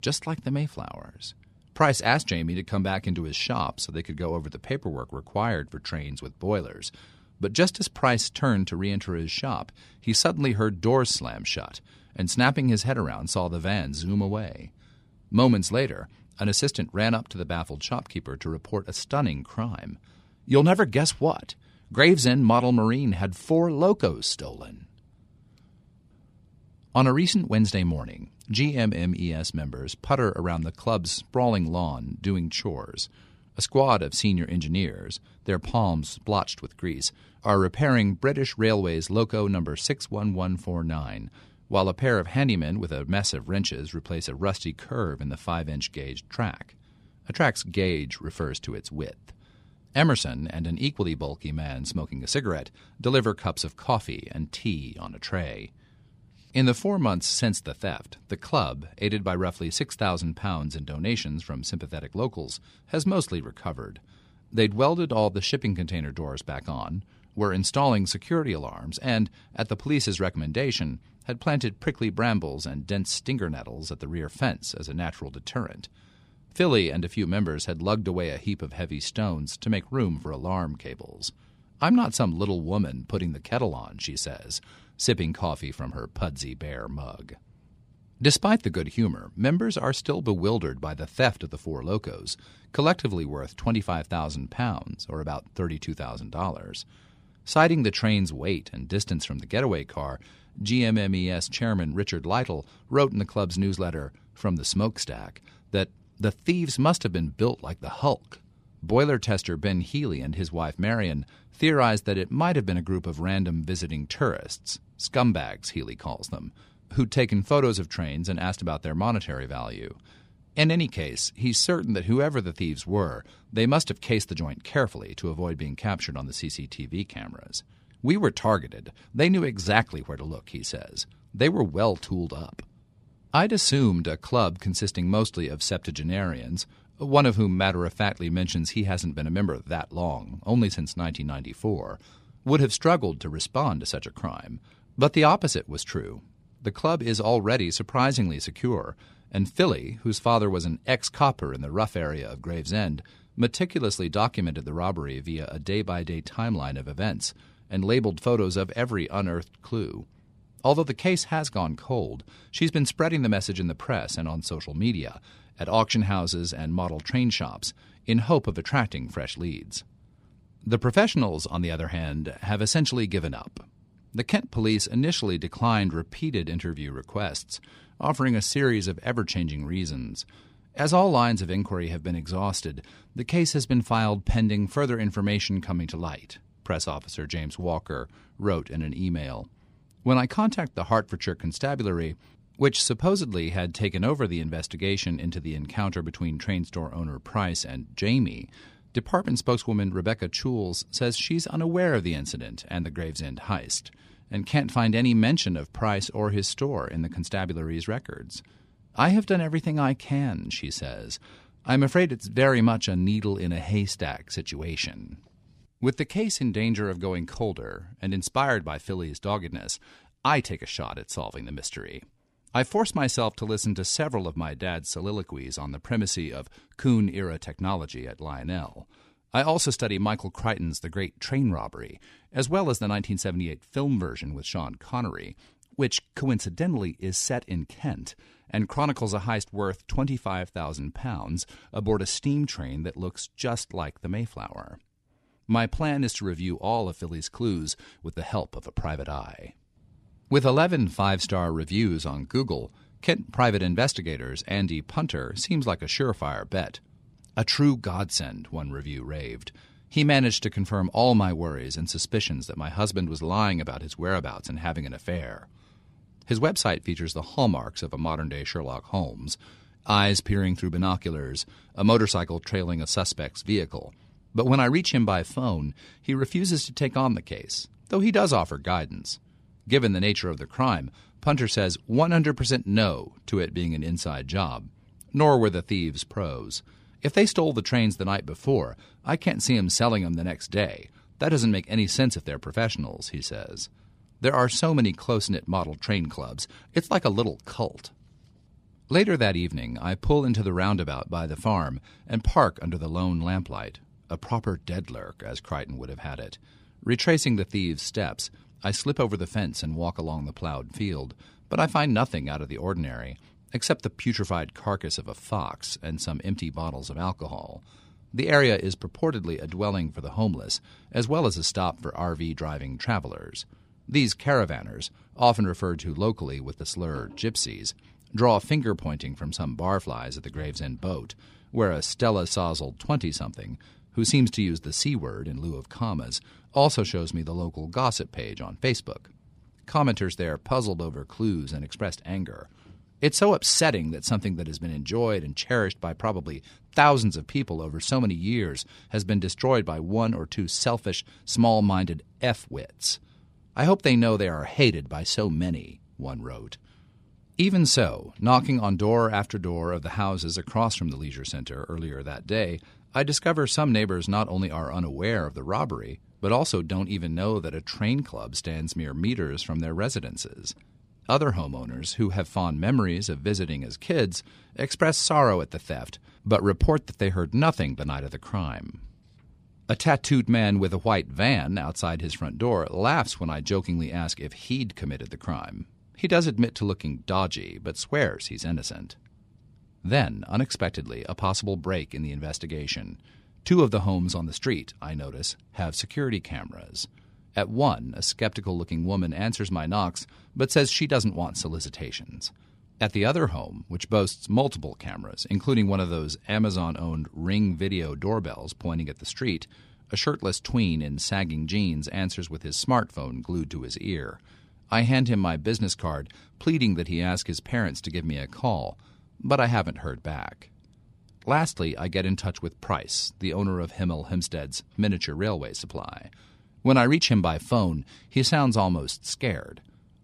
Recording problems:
none

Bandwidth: 15 kHz